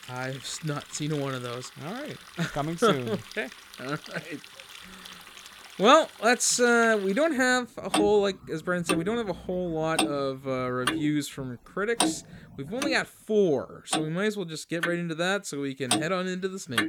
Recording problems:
household noises; loud; throughout; 7 dB below the speech

